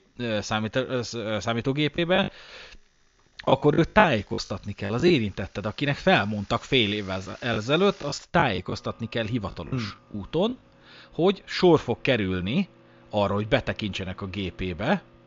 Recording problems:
high frequencies cut off; noticeable; nothing above 7 kHz
household noises; faint; throughout; 30 dB below the speech
choppy; very; from 2 to 5 s and from 7 to 11 s; 12% of the speech affected

